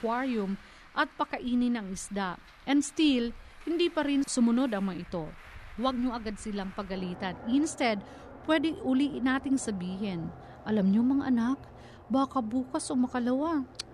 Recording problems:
traffic noise; noticeable; throughout; 20 dB below the speech

